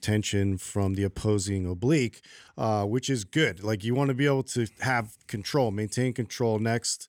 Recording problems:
none

